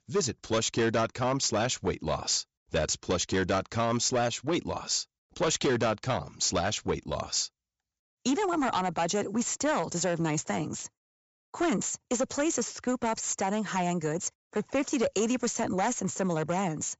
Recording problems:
high frequencies cut off; noticeable; nothing above 8 kHz
distortion; slight; 9% of the sound clipped

